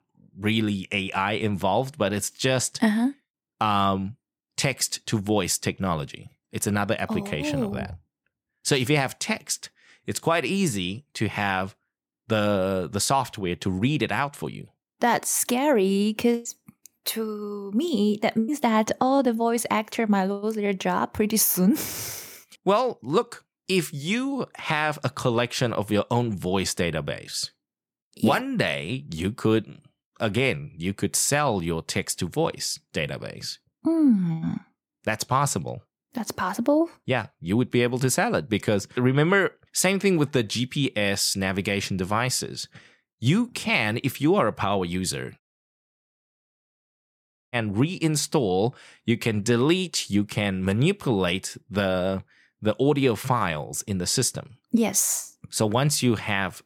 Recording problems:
audio cutting out; at 45 s for 2 s

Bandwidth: 18.5 kHz